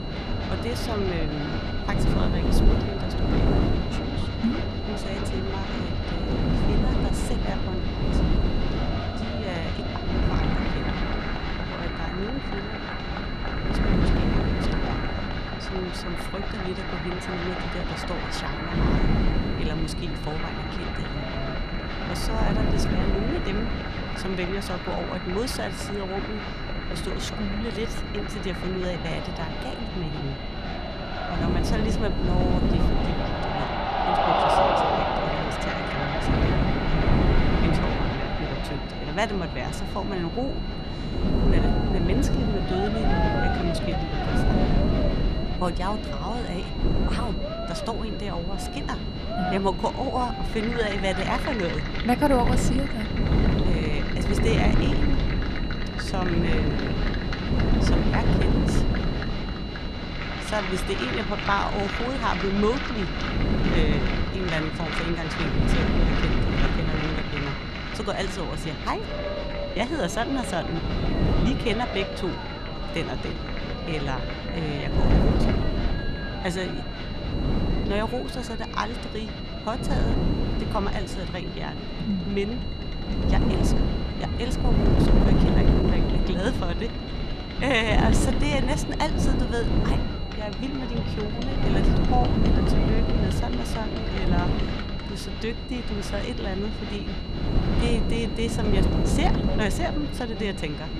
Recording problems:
wind noise on the microphone; heavy; 3 dB below the speech
crowd noise; loud; throughout; 2 dB below the speech
high-pitched whine; noticeable; throughout; 4 kHz, 10 dB below the speech
voice in the background; faint; throughout; 30 dB below the speech

